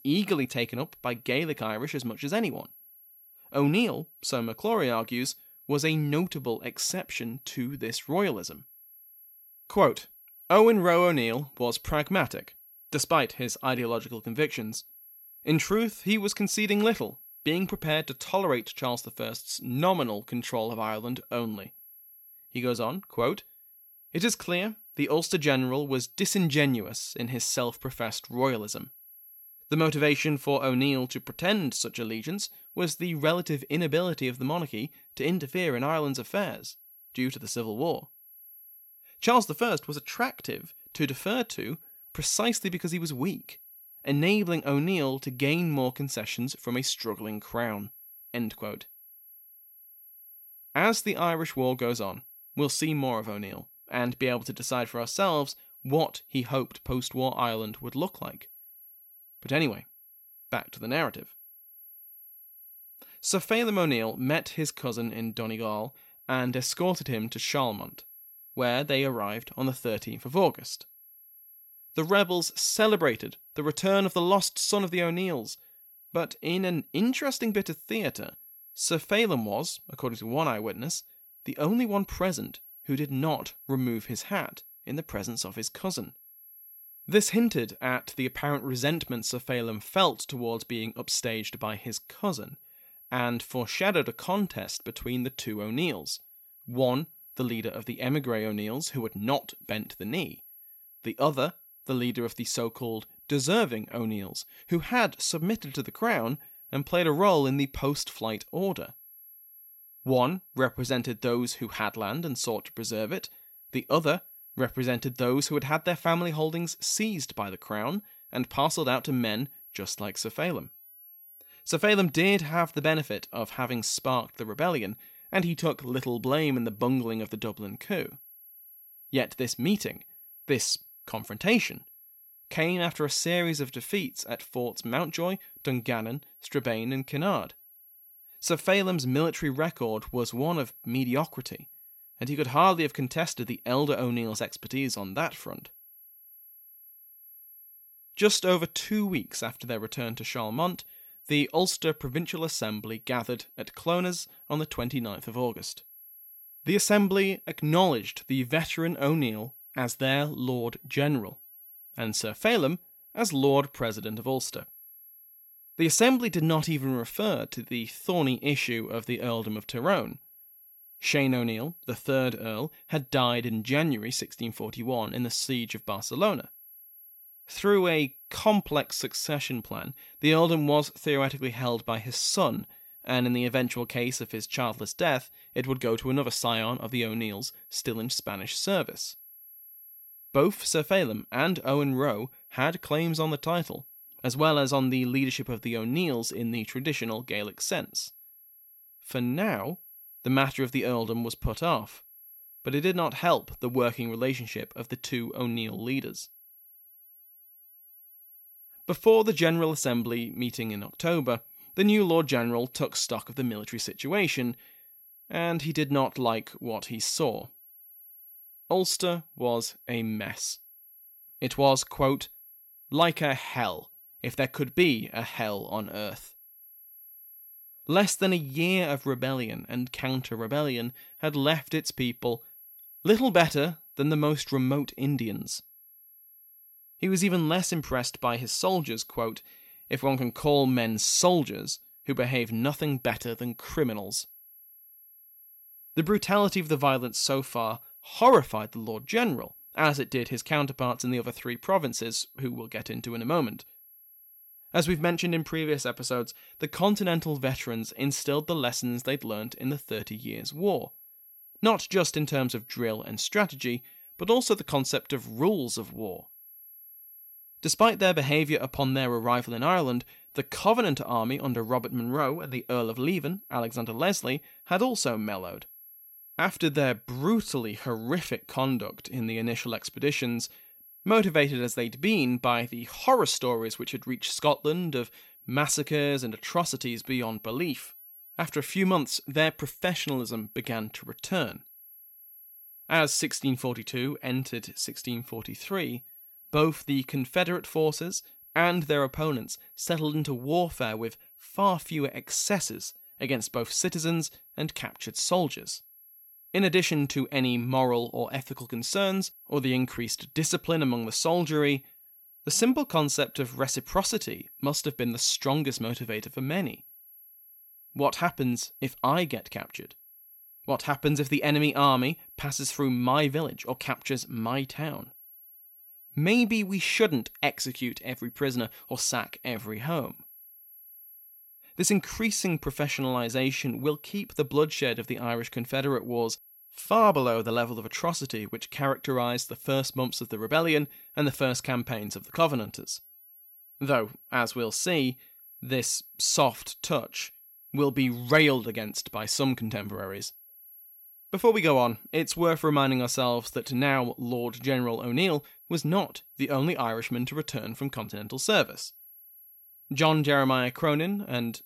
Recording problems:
high-pitched whine; faint; throughout; 11.5 kHz, 20 dB below the speech

